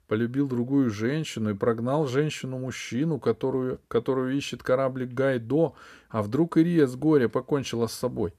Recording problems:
none

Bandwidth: 14.5 kHz